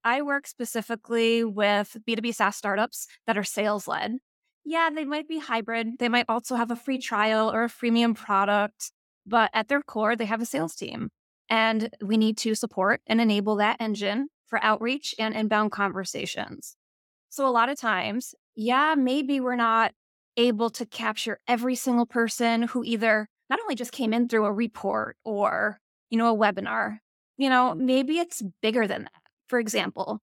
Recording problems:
uneven, jittery; strongly; from 1 to 29 s

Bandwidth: 17 kHz